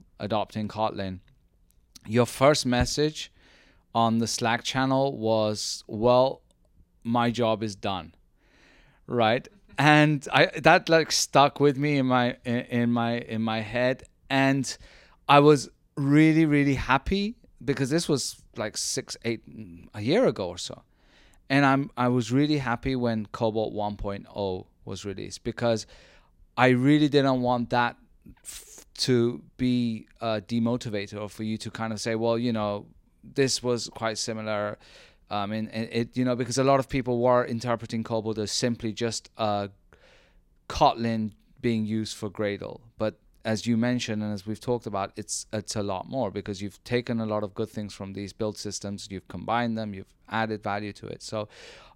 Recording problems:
none

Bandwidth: 16 kHz